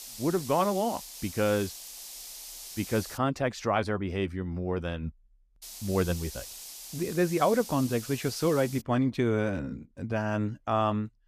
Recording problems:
hiss; noticeable; until 3 s and from 5.5 to 9 s; 10 dB below the speech

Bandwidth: 14.5 kHz